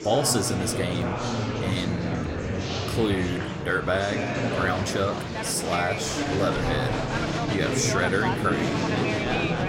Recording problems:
murmuring crowd; very loud; throughout; as loud as the speech

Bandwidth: 16.5 kHz